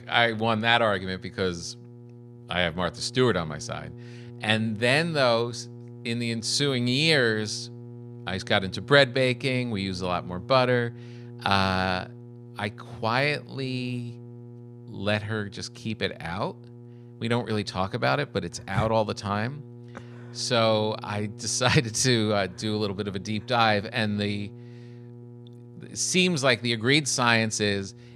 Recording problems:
electrical hum; faint; throughout; 60 Hz, 25 dB below the speech

